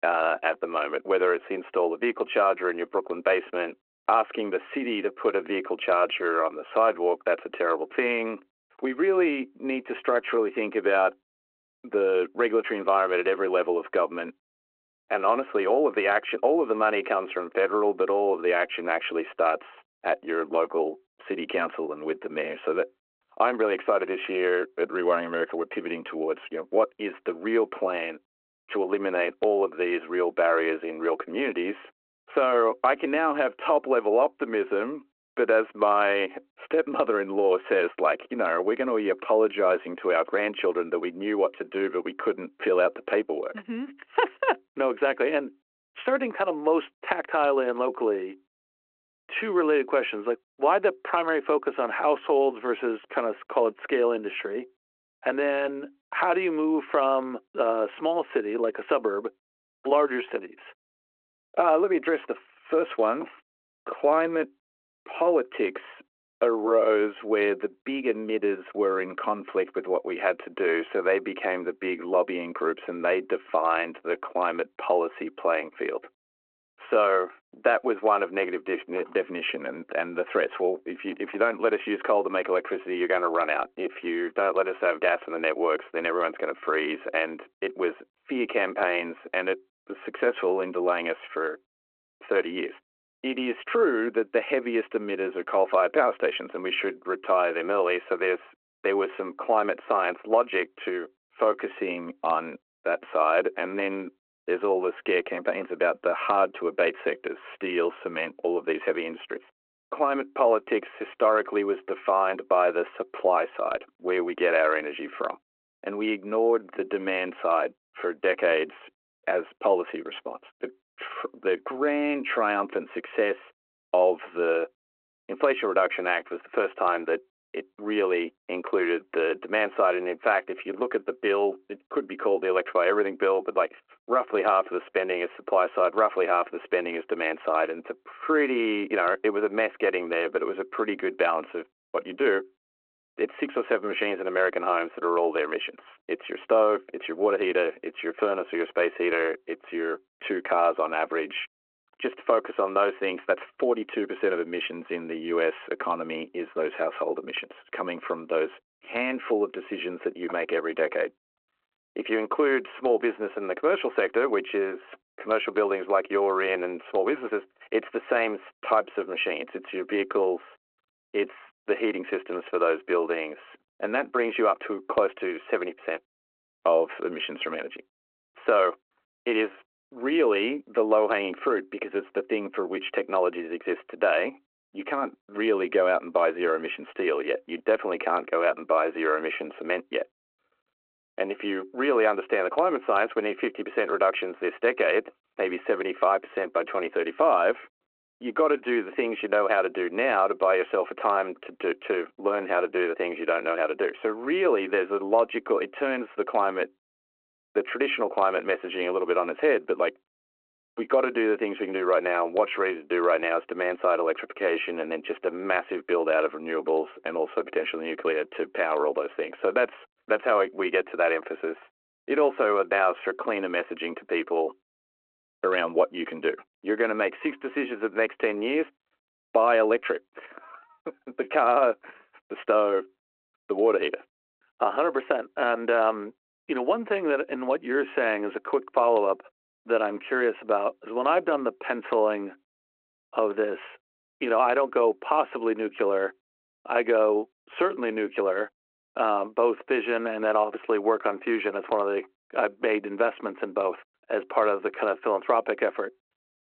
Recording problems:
phone-call audio

